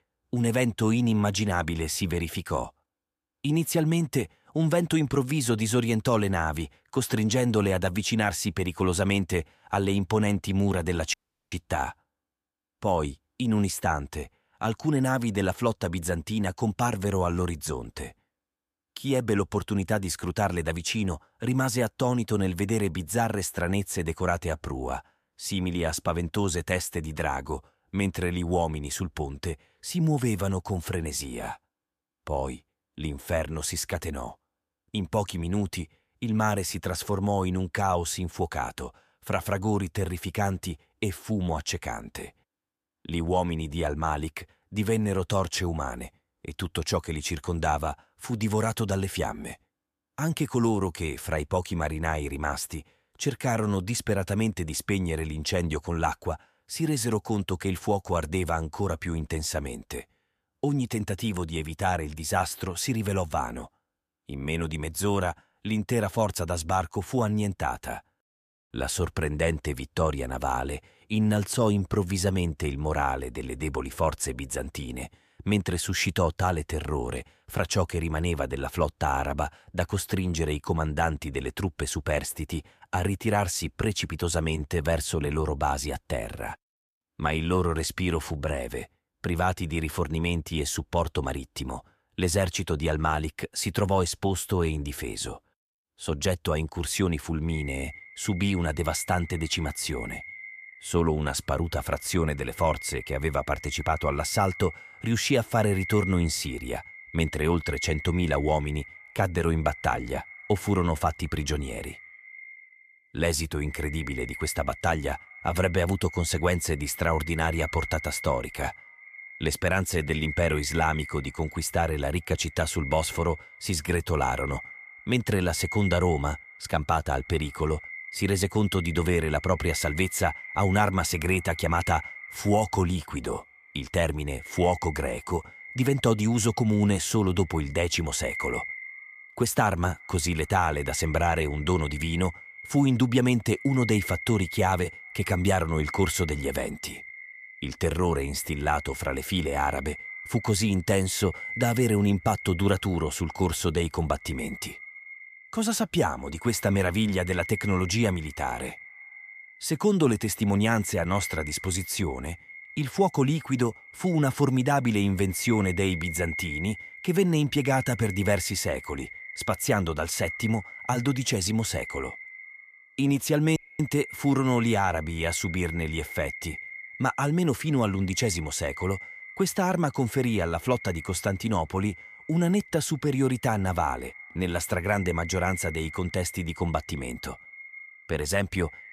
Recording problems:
echo of what is said; noticeable; from 1:37 on; 120 ms later, 10 dB below the speech
audio cutting out; at 11 s and at 2:54

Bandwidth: 14.5 kHz